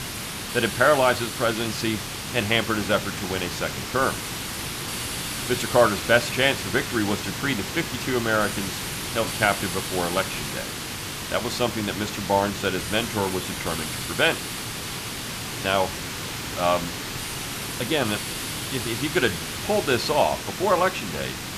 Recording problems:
hiss; loud; throughout; 5 dB below the speech

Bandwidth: 14.5 kHz